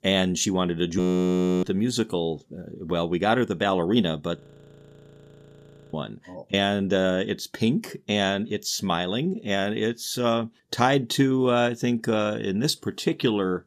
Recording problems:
audio freezing; at 1 s for 0.5 s and at 4.5 s for 1.5 s

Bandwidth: 14.5 kHz